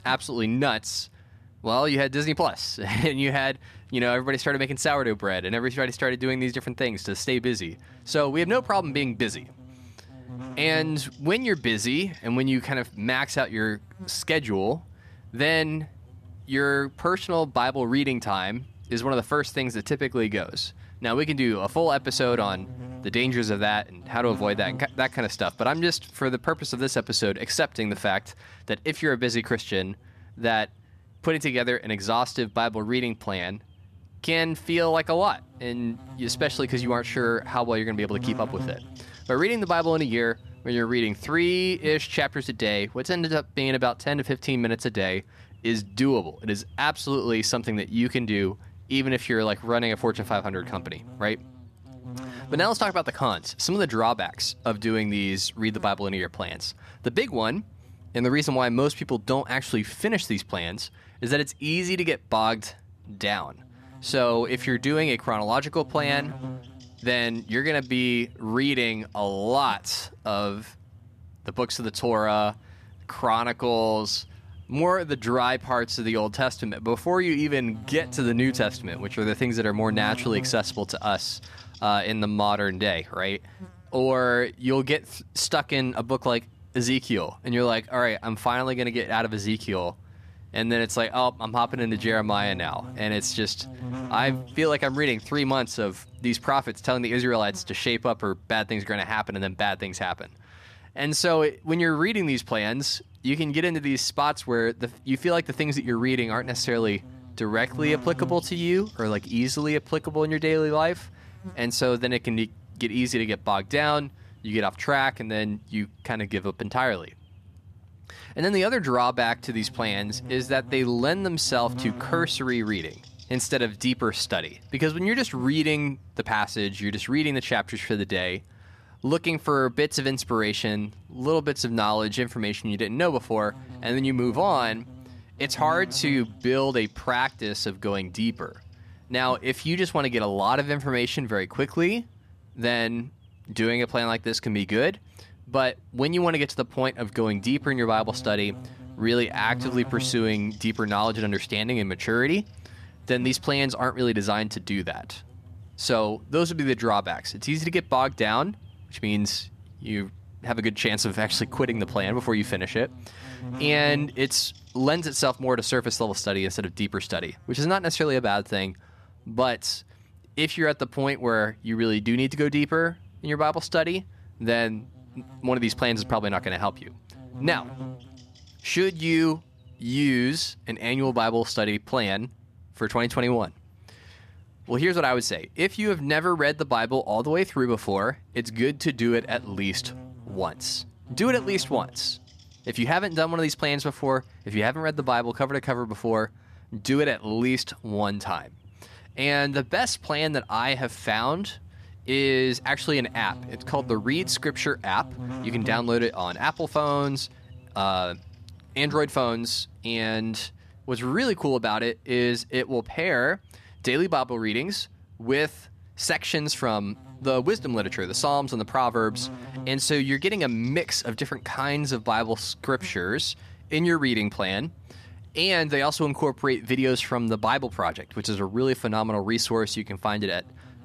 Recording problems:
electrical hum; faint; throughout; 50 Hz, 25 dB below the speech

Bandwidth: 14.5 kHz